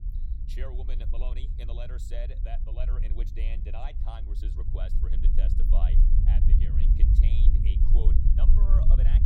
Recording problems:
low rumble; loud; throughout; 1 dB below the speech

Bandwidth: 16.5 kHz